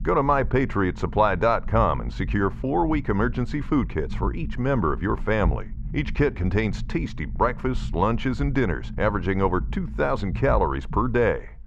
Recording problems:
muffled; very; fading above 2.5 kHz
low rumble; faint; throughout; 25 dB below the speech

